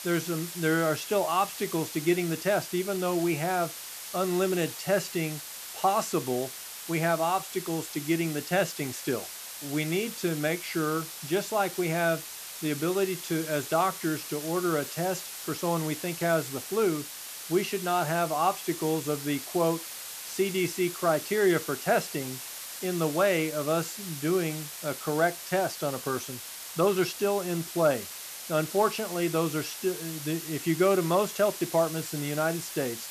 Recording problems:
hiss; loud; throughout; 9 dB below the speech

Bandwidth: 14.5 kHz